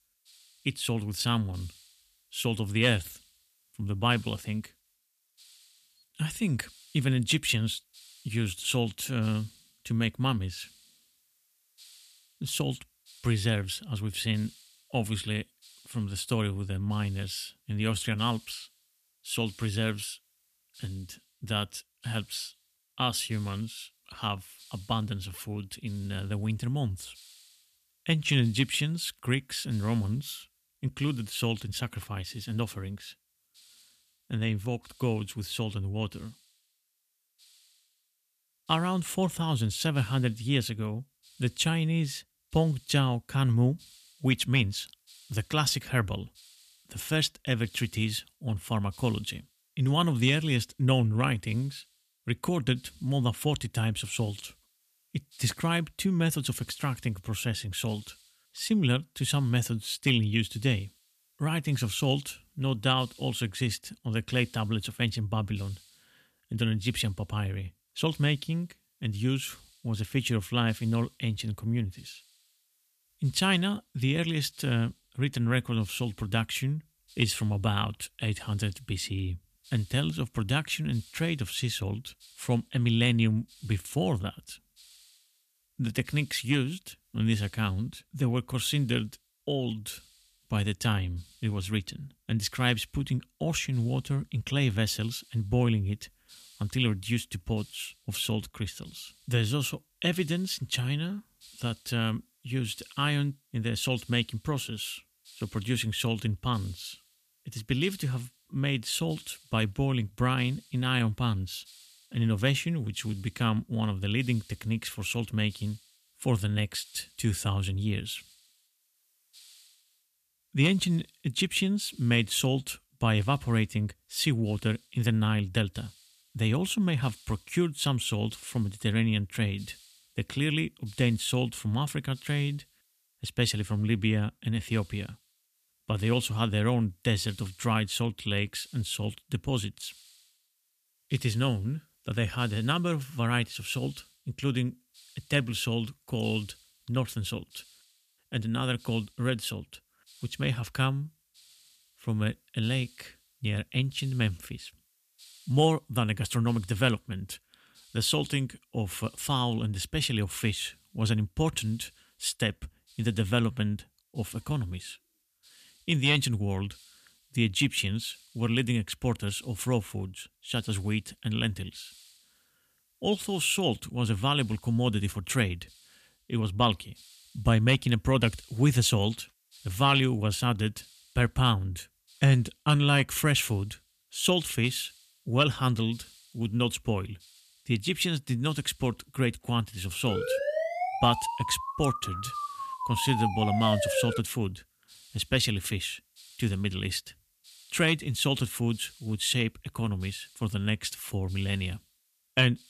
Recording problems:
hiss; faint; throughout; 25 dB below the speech
siren; loud; from 3:10 to 3:14; peak 1 dB above the speech

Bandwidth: 14.5 kHz